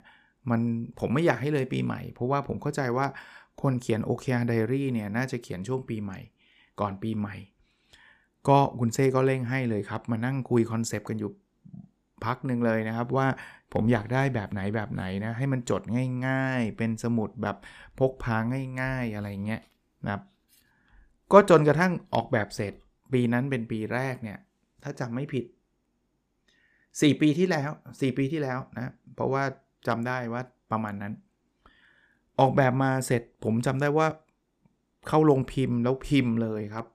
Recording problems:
none

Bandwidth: 14.5 kHz